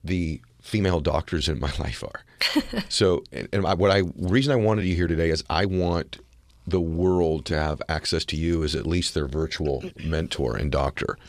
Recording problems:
uneven, jittery; strongly; from 0.5 to 10 s

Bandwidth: 14.5 kHz